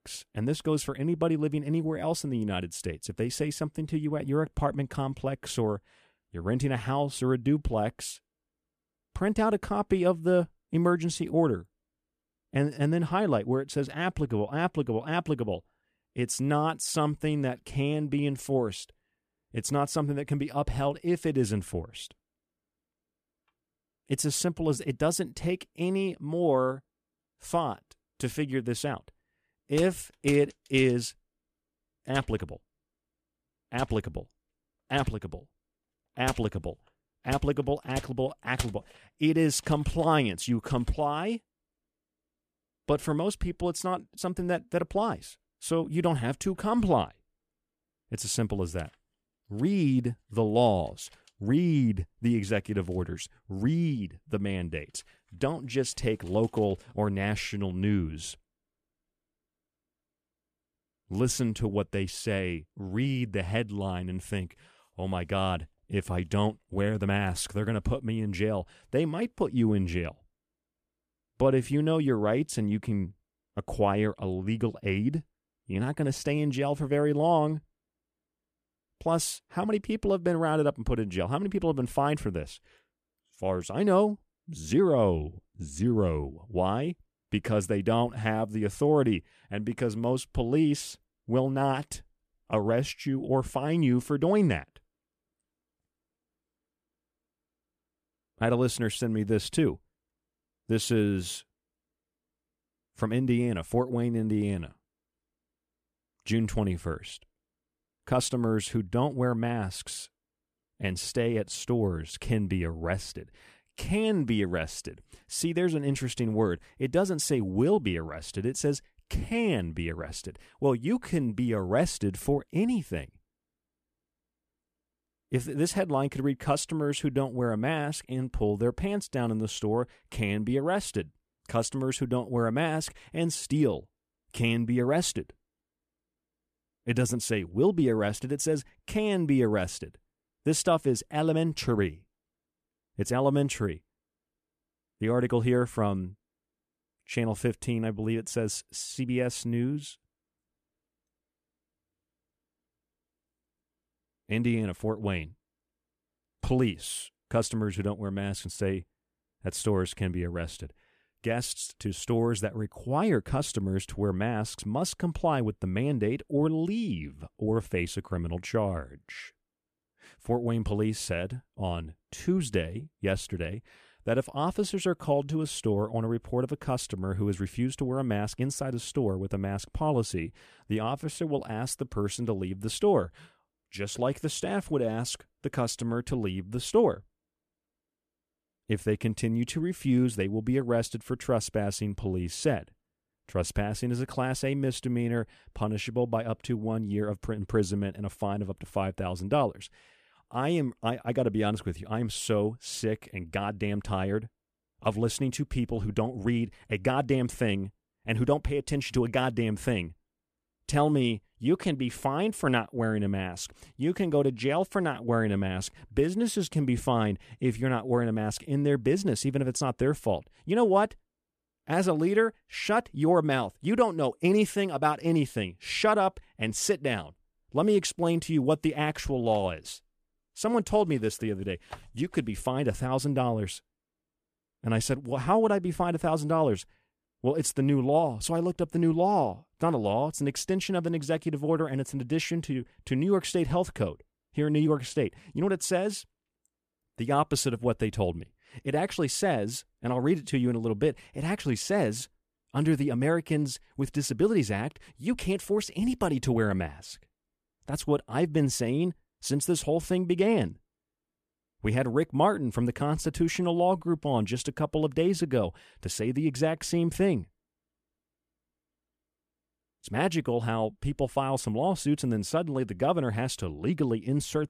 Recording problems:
none

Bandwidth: 14.5 kHz